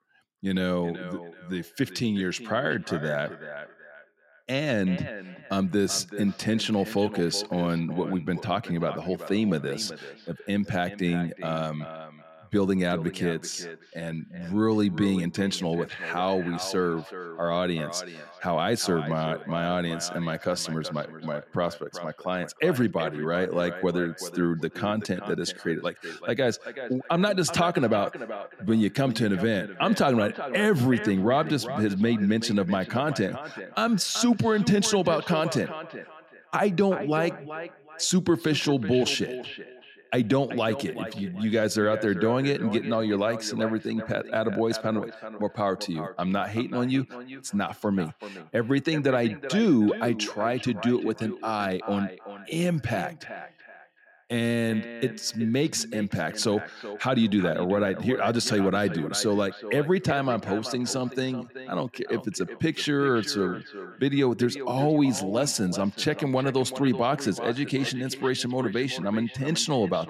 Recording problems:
echo of what is said; noticeable; throughout; 380 ms later, 15 dB below the speech

